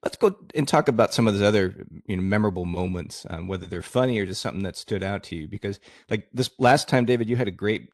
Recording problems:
none

